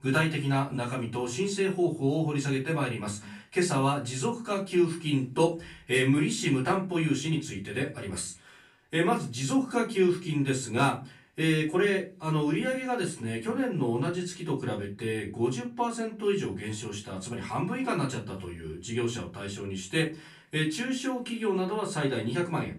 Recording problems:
off-mic speech; far
room echo; very slight; dies away in 0.3 s

